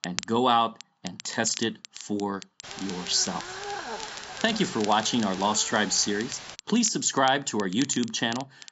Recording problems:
high frequencies cut off; noticeable; nothing above 7.5 kHz
hiss; noticeable; from 2.5 to 6.5 s; 15 dB below the speech
crackle, like an old record; noticeable; 15 dB below the speech

